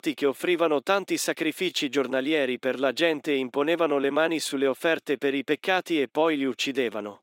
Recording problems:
thin; very slightly; fading below 300 Hz

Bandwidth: 16 kHz